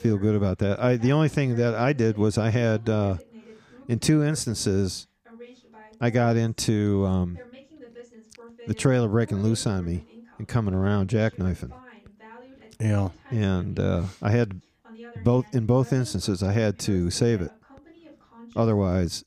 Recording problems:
voice in the background; faint; throughout; 25 dB below the speech

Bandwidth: 15 kHz